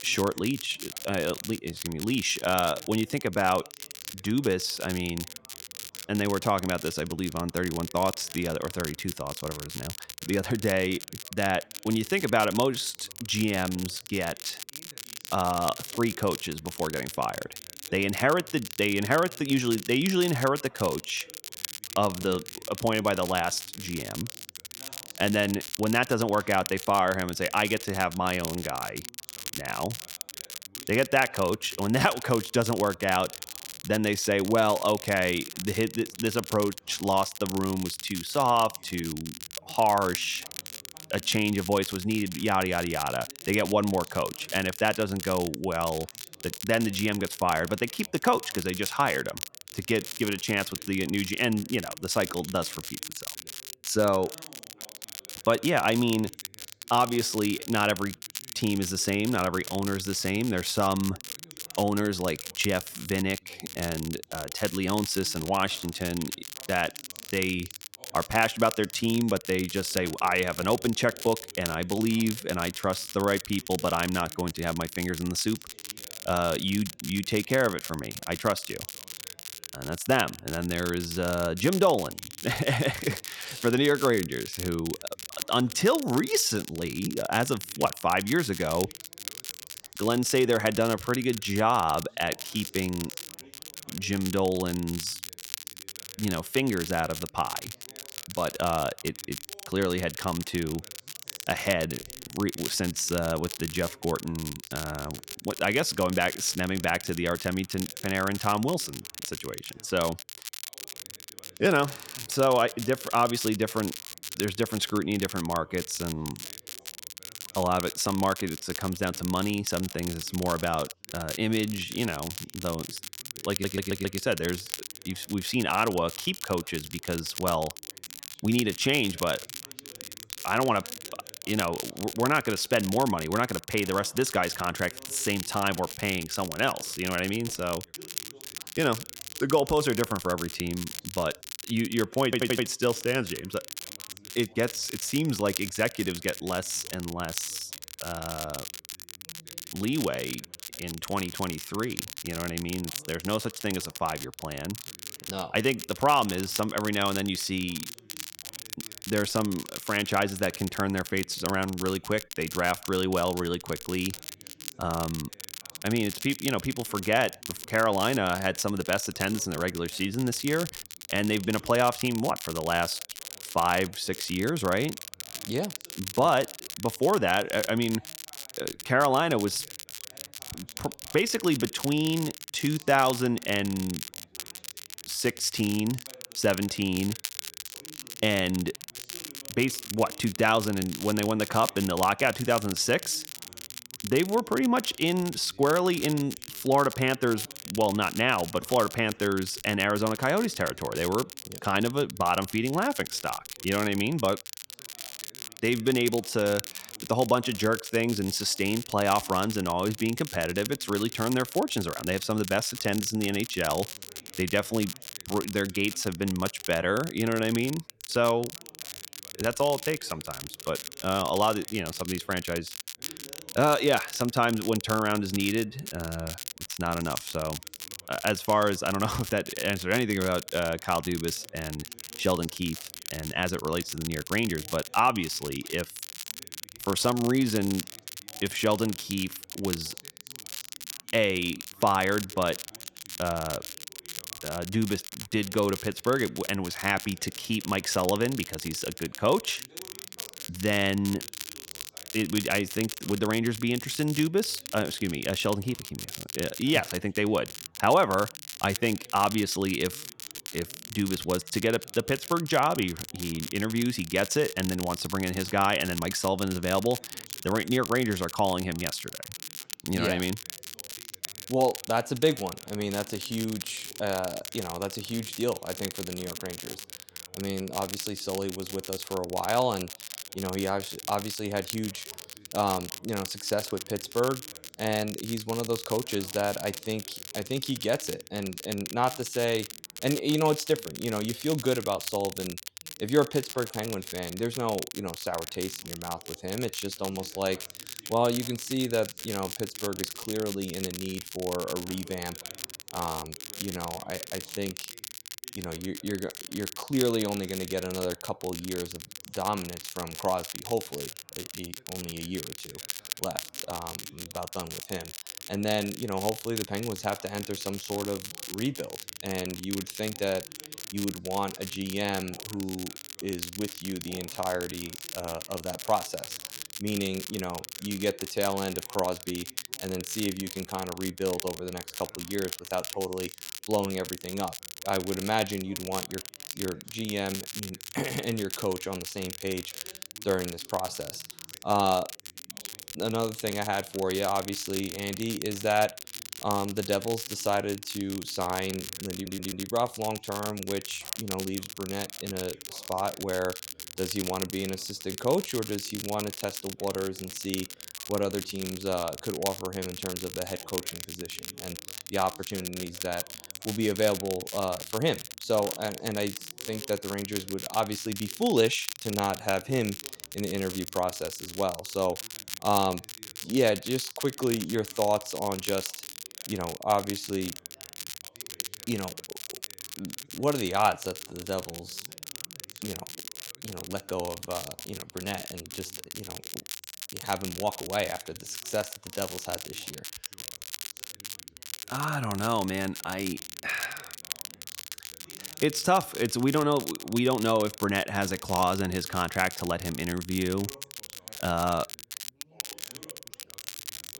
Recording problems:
crackle, like an old record; loud; 9 dB below the speech
background chatter; faint; throughout; 3 voices, 30 dB below the speech
audio stuttering; at 2:04, at 2:22 and at 5:49

